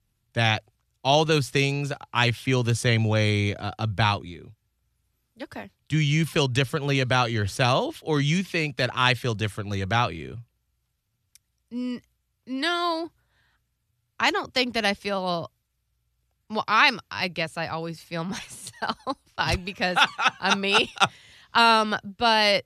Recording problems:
none

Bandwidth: 13.5 kHz